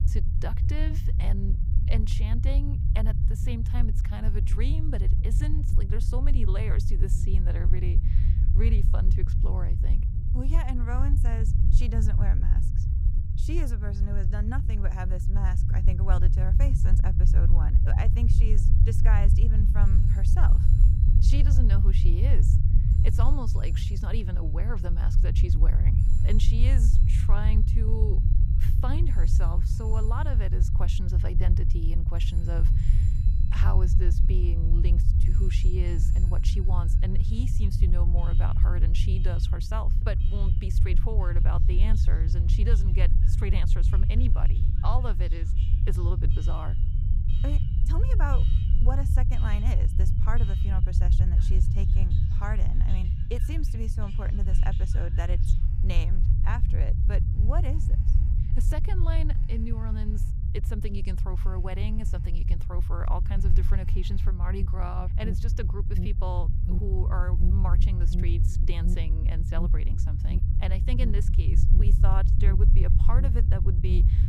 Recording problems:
alarms or sirens; loud; throughout; 9 dB below the speech
low rumble; loud; throughout; 3 dB below the speech

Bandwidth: 15.5 kHz